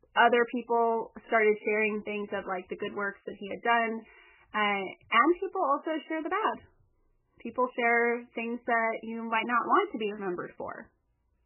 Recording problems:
garbled, watery; badly; nothing above 3 kHz

